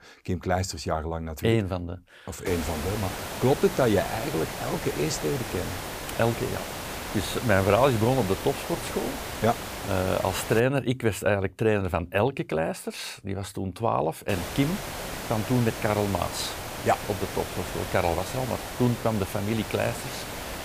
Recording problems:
hiss; loud; from 2.5 to 11 s and from 14 s on; 7 dB below the speech

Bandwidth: 15 kHz